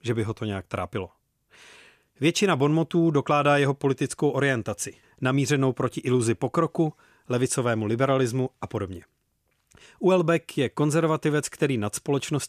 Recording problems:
none

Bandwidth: 14.5 kHz